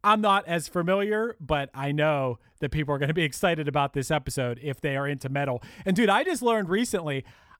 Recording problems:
none

